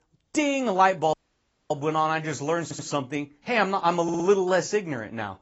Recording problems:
garbled, watery; badly; nothing above 7.5 kHz
audio cutting out; at 1 s for 0.5 s
audio stuttering; at 2.5 s and at 4 s

